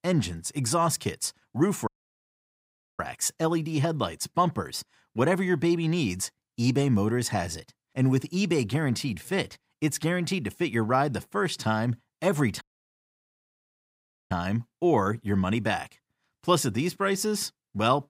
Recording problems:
audio cutting out; at 2 s for 1 s and at 13 s for 1.5 s

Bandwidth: 15.5 kHz